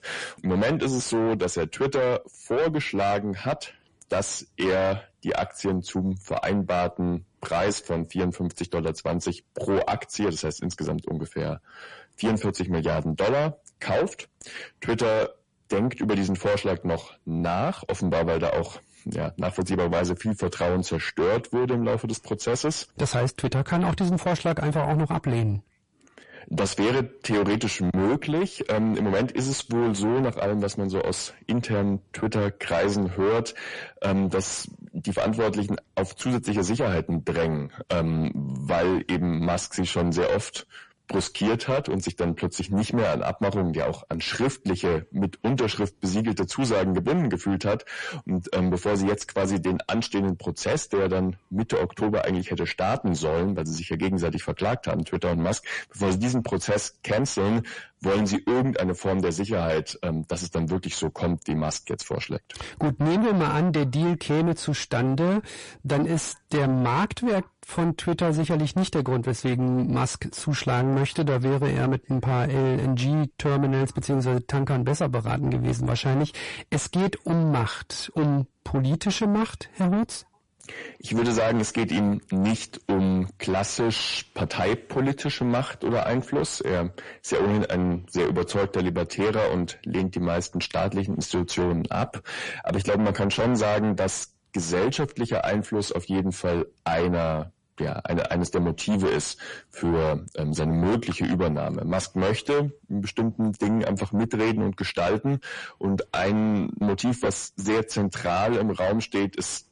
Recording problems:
distortion; heavy; 6 dB below the speech
garbled, watery; slightly; nothing above 10.5 kHz

